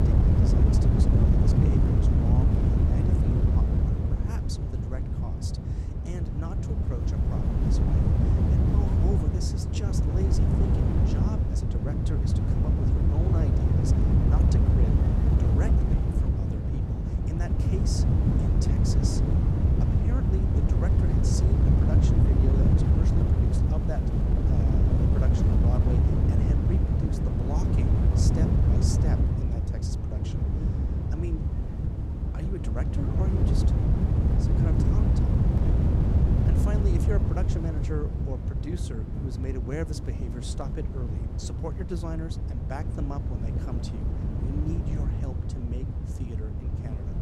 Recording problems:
wind noise on the microphone; heavy; 5 dB above the speech

